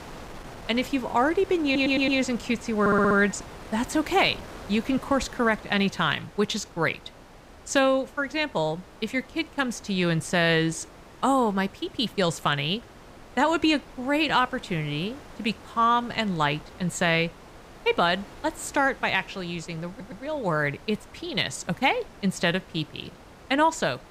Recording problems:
wind noise on the microphone; occasional gusts; 20 dB below the speech
audio stuttering; at 1.5 s, at 3 s and at 20 s

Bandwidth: 15.5 kHz